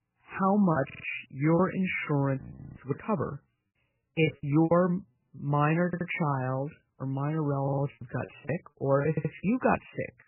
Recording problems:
garbled, watery; badly; nothing above 3 kHz
choppy; very; 8% of the speech affected
audio stuttering; 4 times, first at 1 s
uneven, jittery; strongly; from 2.5 to 8 s
audio freezing; at 2.5 s

